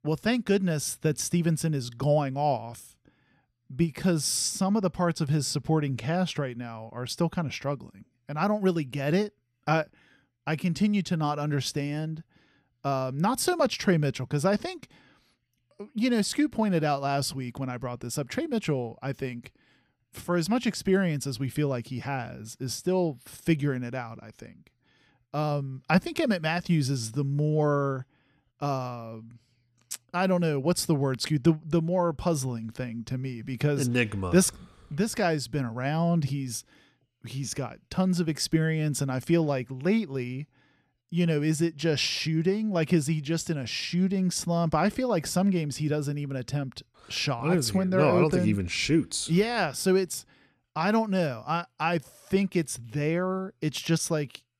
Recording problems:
none

